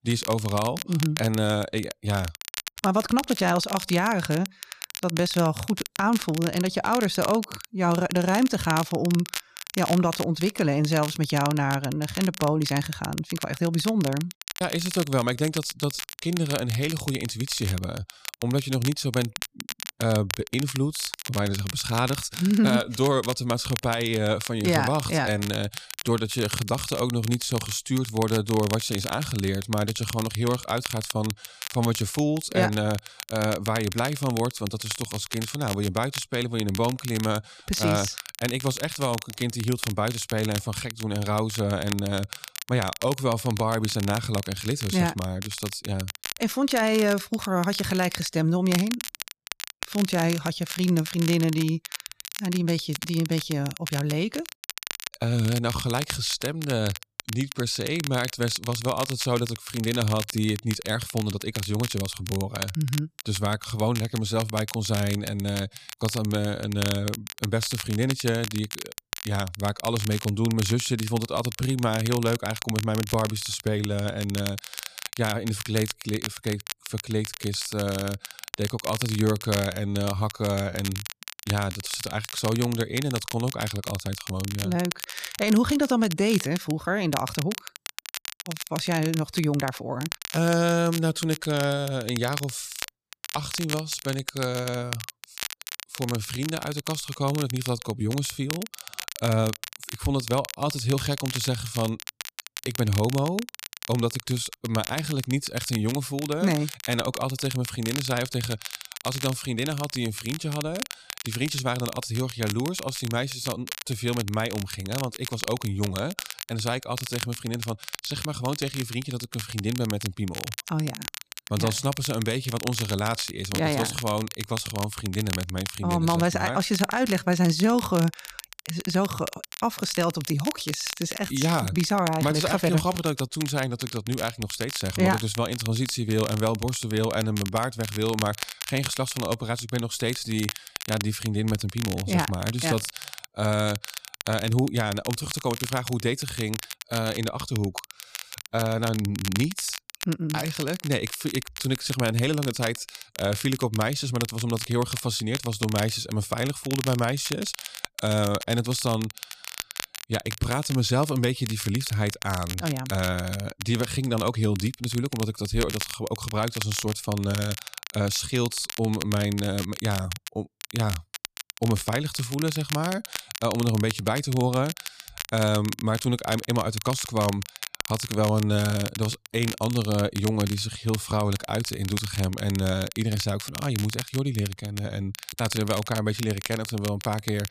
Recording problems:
crackle, like an old record; loud; 9 dB below the speech

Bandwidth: 14.5 kHz